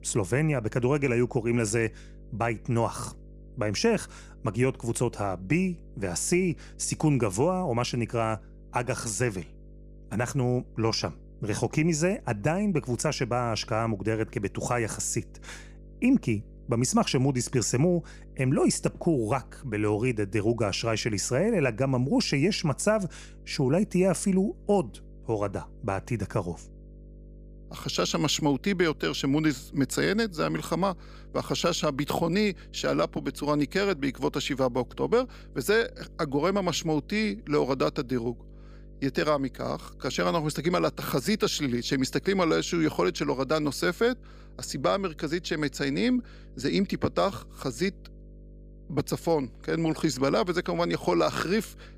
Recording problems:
electrical hum; faint; throughout; 50 Hz, 30 dB below the speech

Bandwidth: 15 kHz